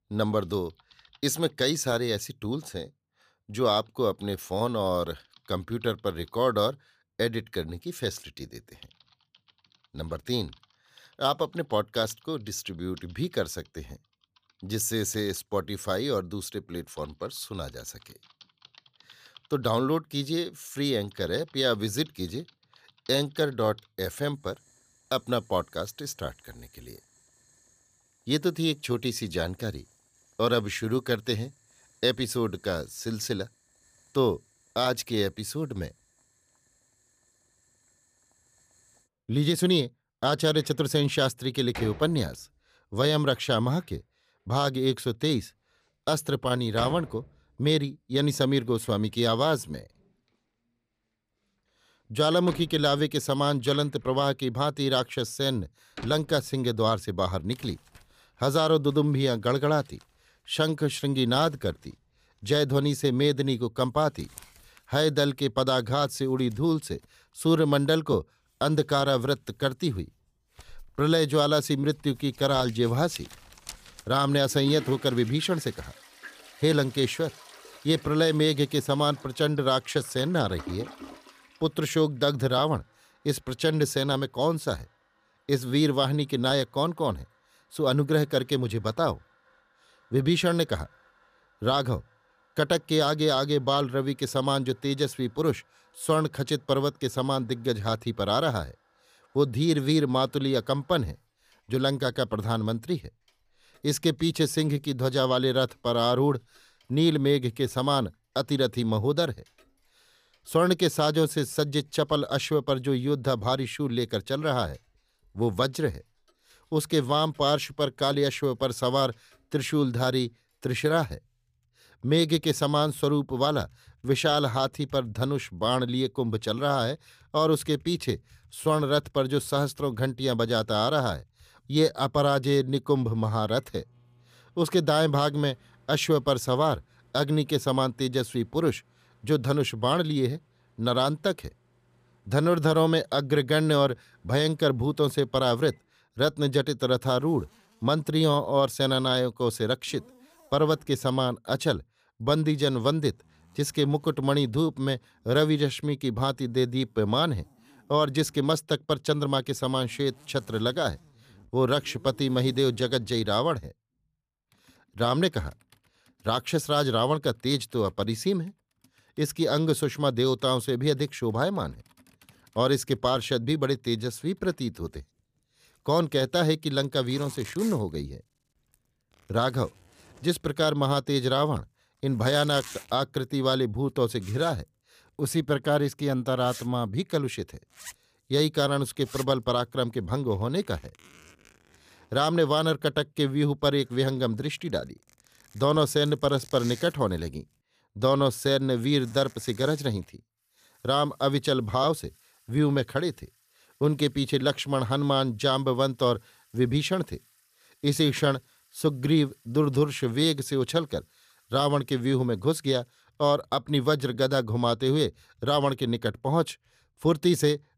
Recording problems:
household noises; faint; throughout; 25 dB below the speech

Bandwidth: 15 kHz